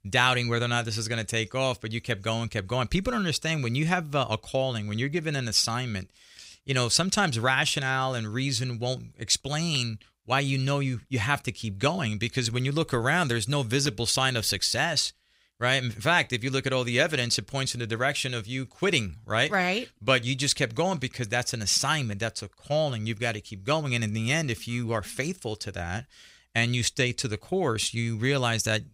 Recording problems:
none

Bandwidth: 15.5 kHz